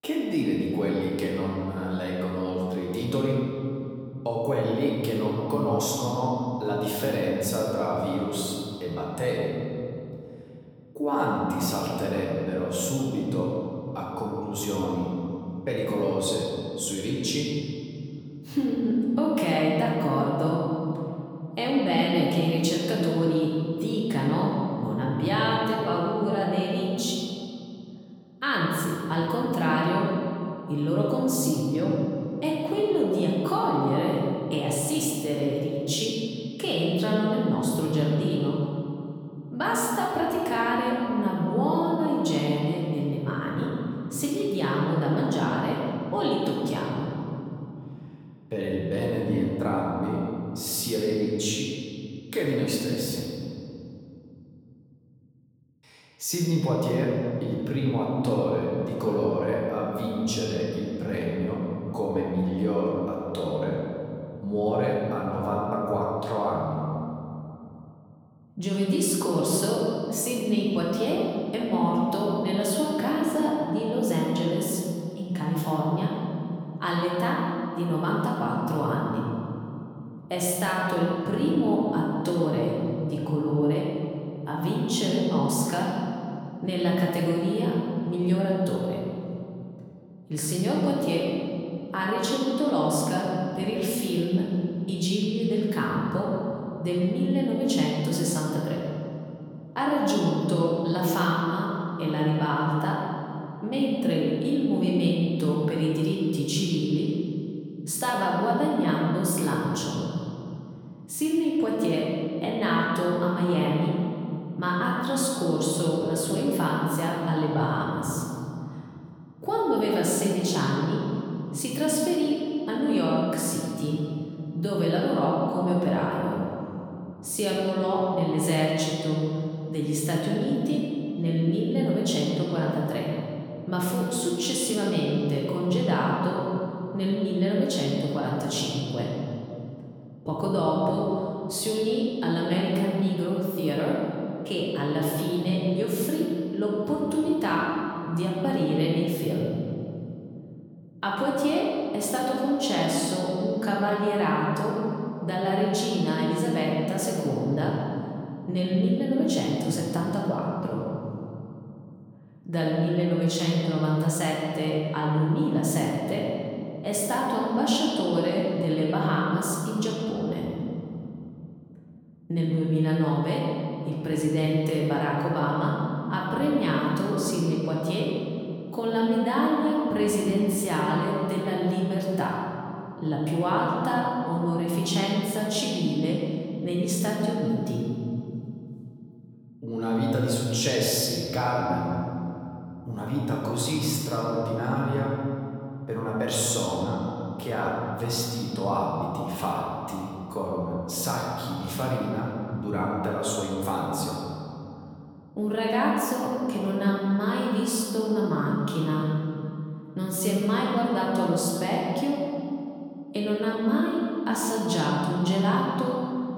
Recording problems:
off-mic speech; far
room echo; noticeable; dies away in 2.9 s

